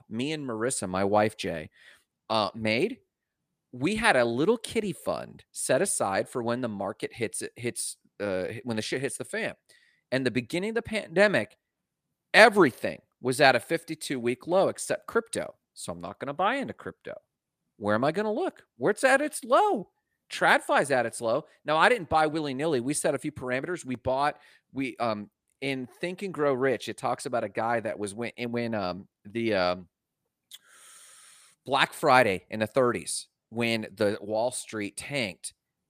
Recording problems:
none

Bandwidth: 15 kHz